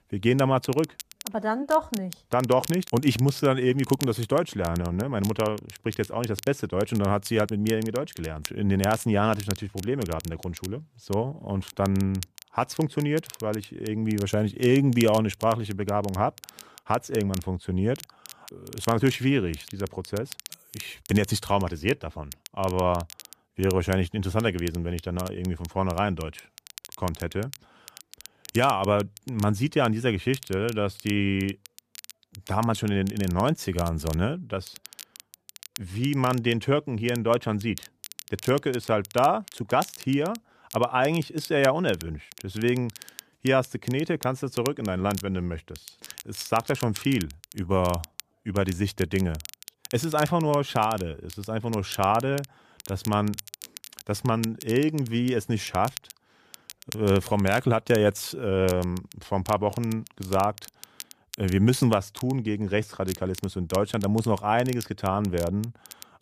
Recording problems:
crackle, like an old record; noticeable; 15 dB below the speech

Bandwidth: 14.5 kHz